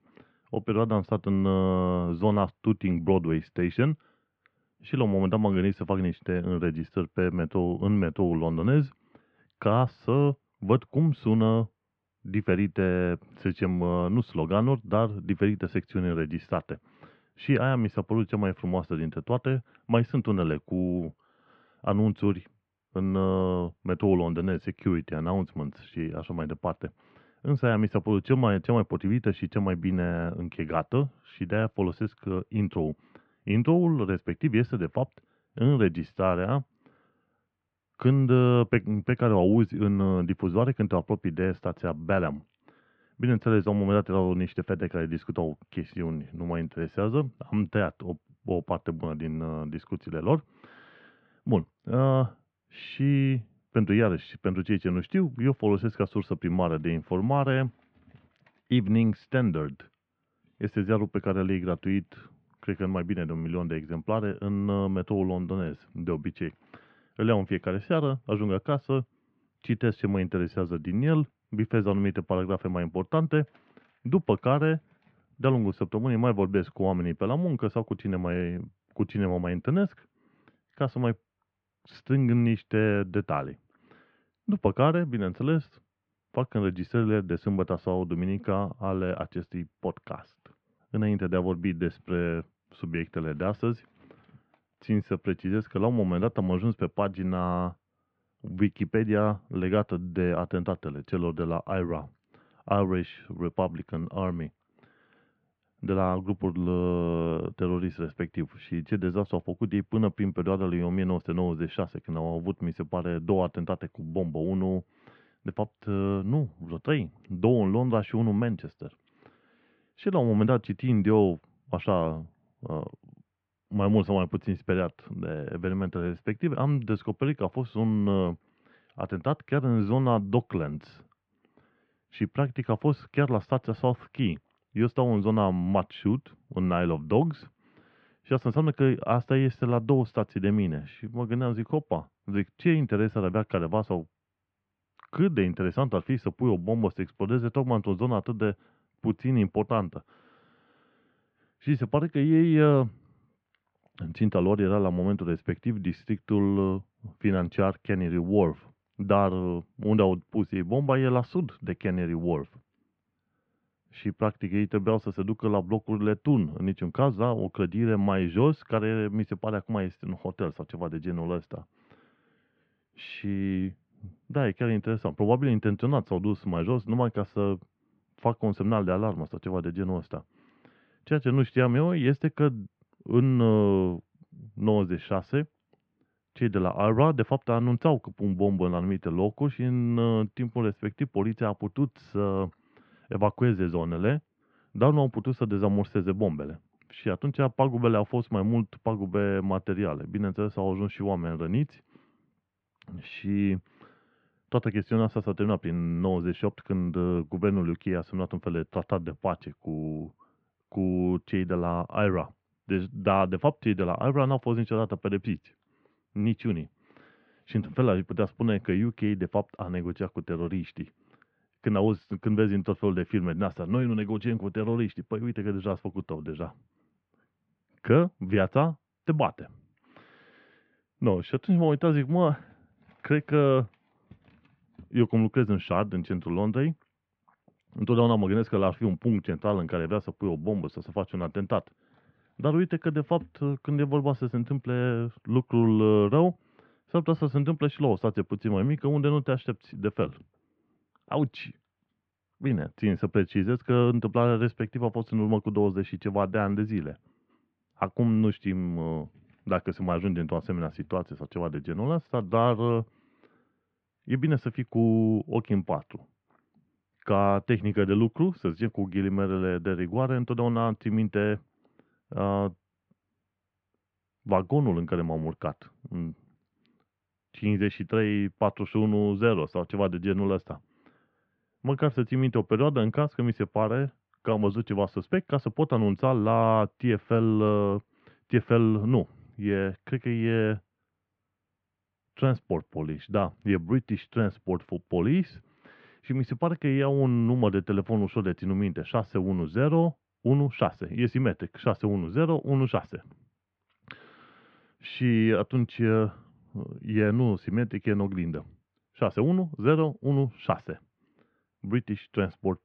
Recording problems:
muffled; very; fading above 2.5 kHz

